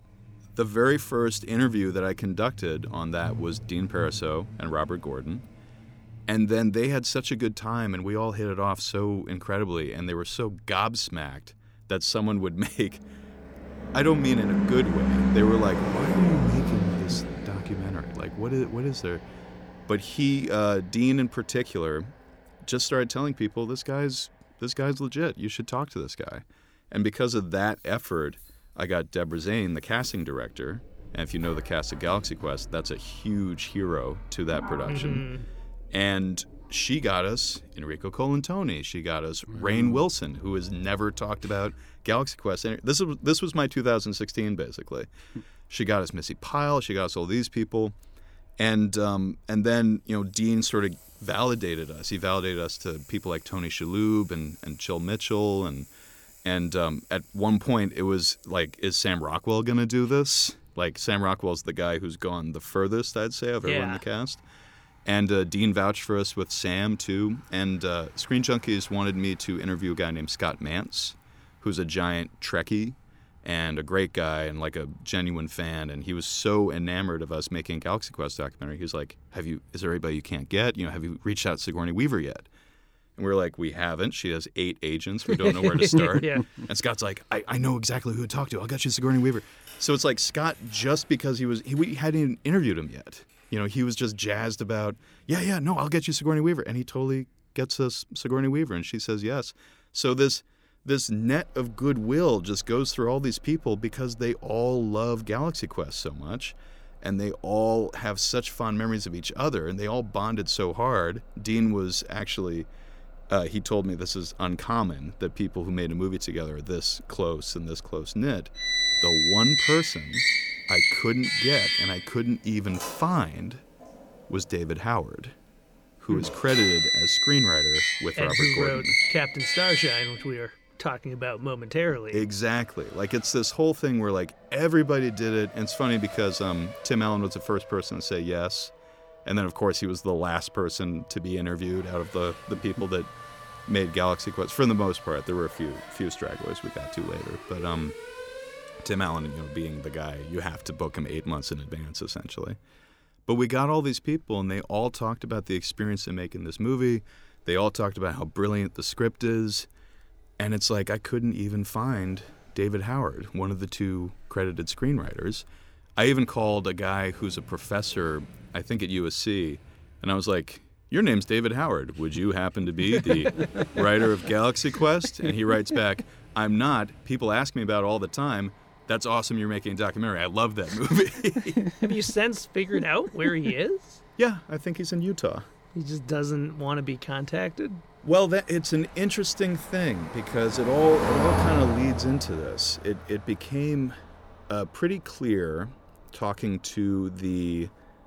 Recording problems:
traffic noise; very loud; throughout; as loud as the speech

